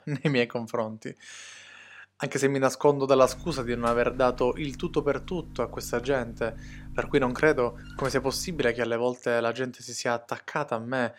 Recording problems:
electrical hum; faint; from 3 to 8.5 s; 50 Hz, 20 dB below the speech

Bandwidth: 16 kHz